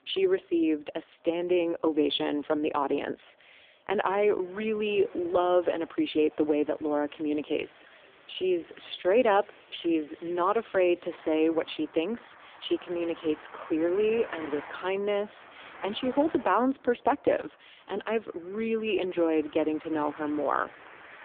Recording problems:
phone-call audio; poor line
traffic noise; faint; throughout; 20 dB below the speech

